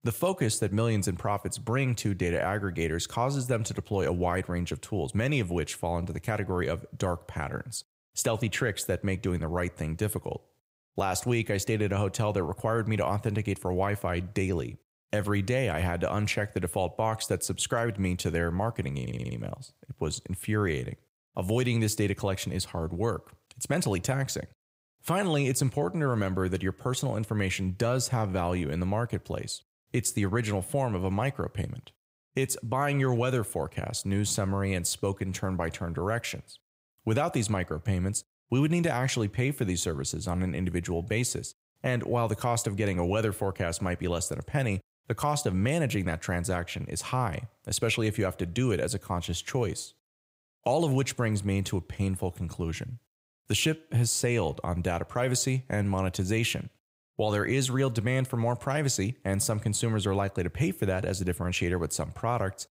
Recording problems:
audio stuttering; at 19 s

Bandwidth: 15.5 kHz